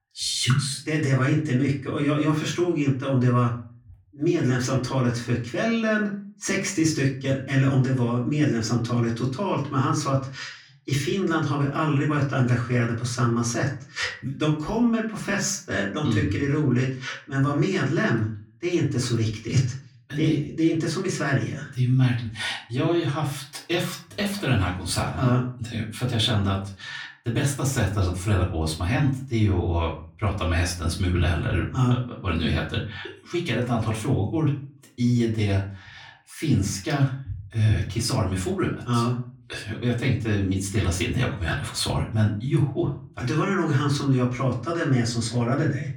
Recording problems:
off-mic speech; far
room echo; slight; dies away in 0.4 s

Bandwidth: 18.5 kHz